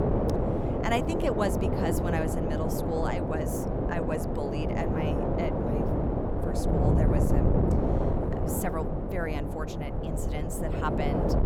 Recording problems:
wind noise on the microphone; heavy; 2 dB above the speech

